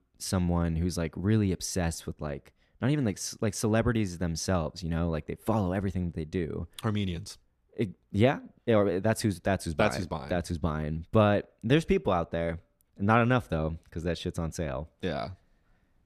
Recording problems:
none

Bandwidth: 14.5 kHz